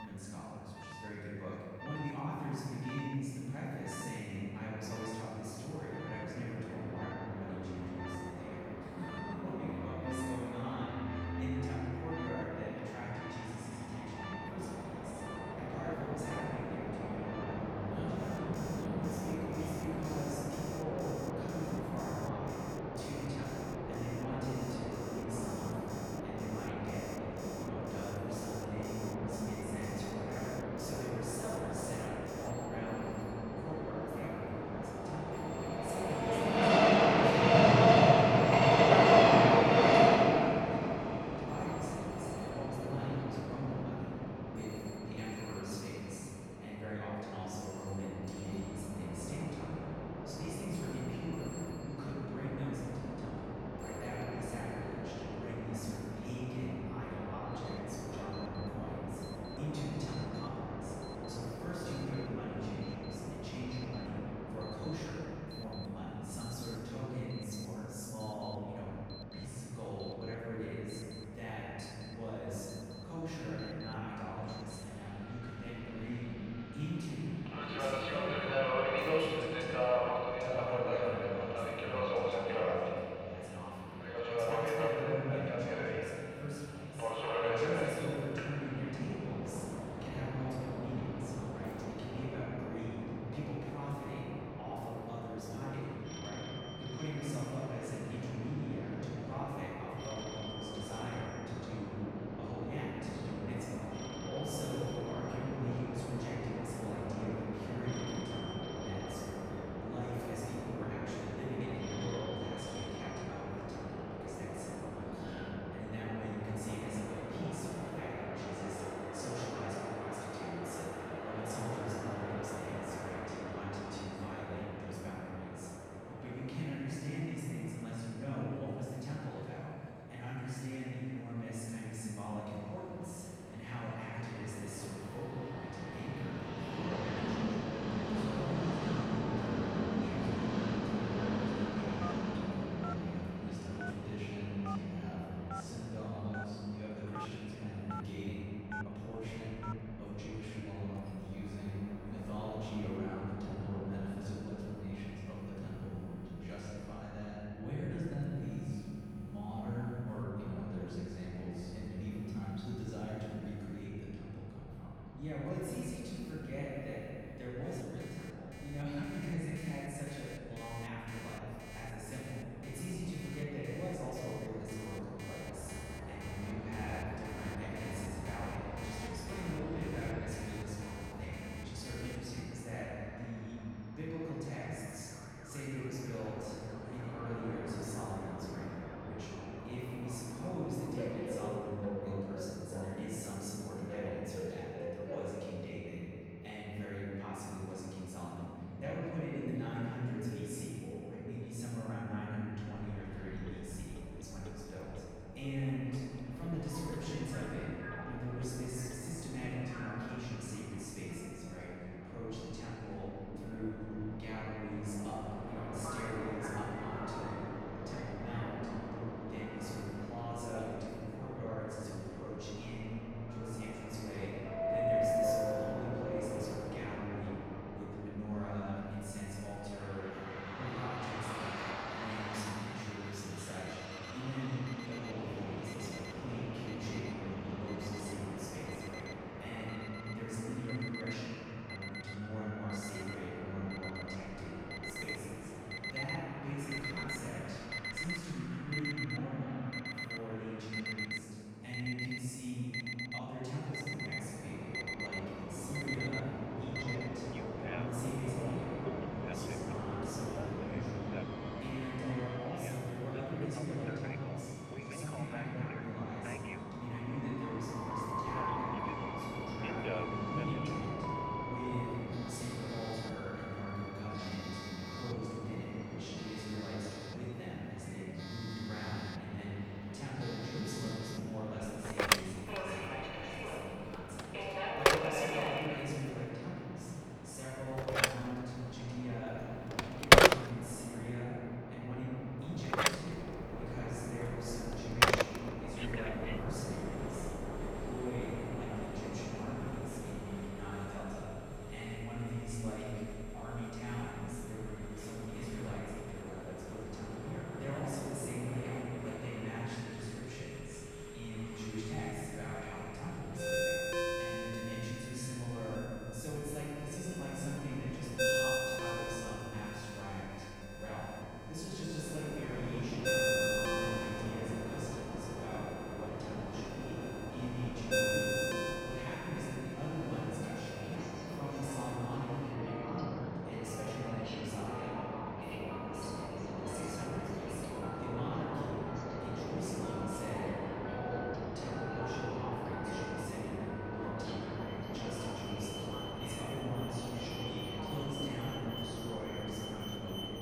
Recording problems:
room echo; strong; dies away in 2.7 s
off-mic speech; far
train or aircraft noise; very loud; throughout; 4 dB above the speech
alarms or sirens; very faint; throughout; 2 dB above the speech
abrupt cut into speech; at the start

